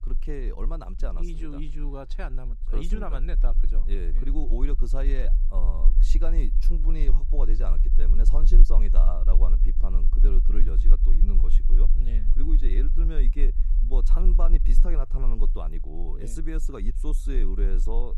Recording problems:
low rumble; noticeable; throughout; 10 dB below the speech

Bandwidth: 15 kHz